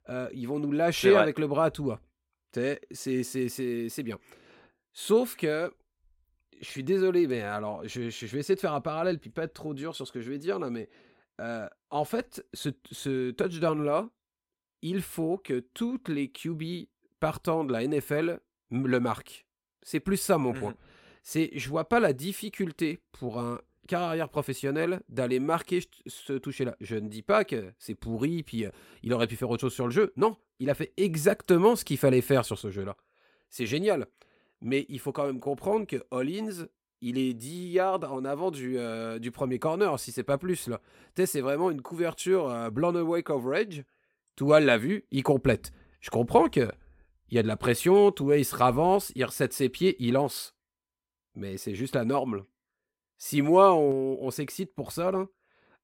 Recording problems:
none

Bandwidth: 16.5 kHz